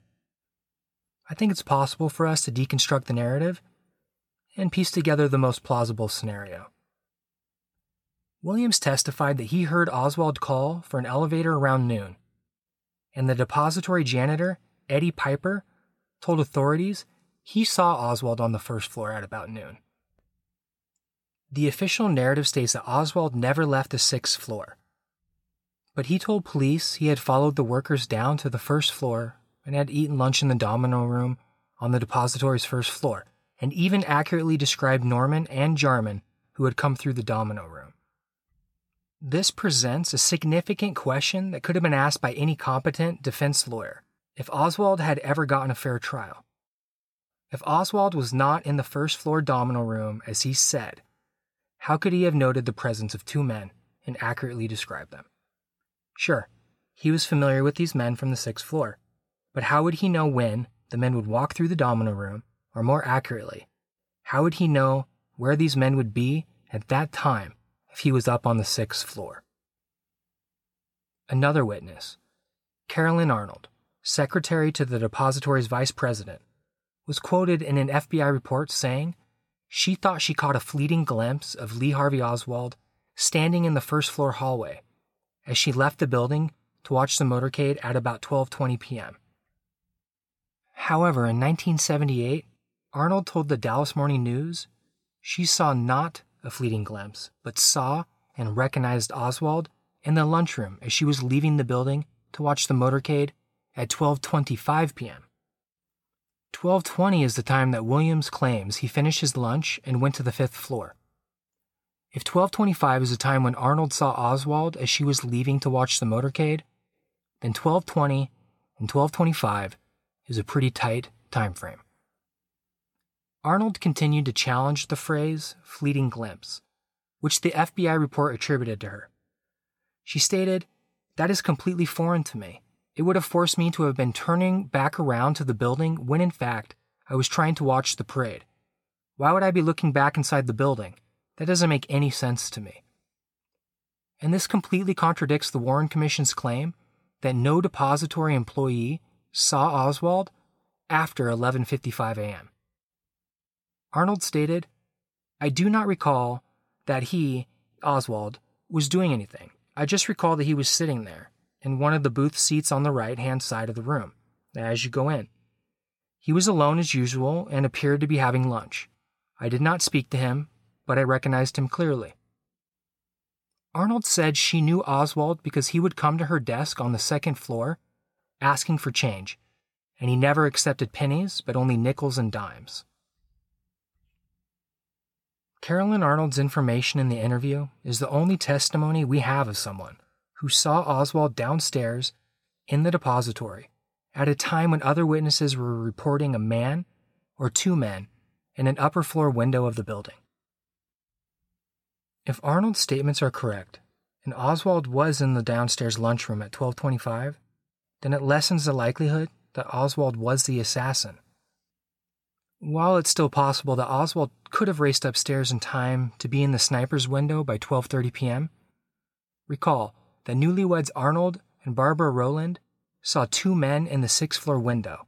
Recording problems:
none

